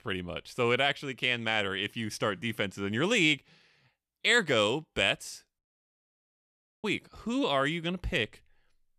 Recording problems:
audio cutting out; at 5.5 s for 1.5 s

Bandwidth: 14.5 kHz